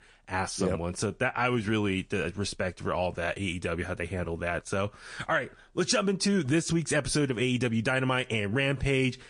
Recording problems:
garbled, watery; slightly

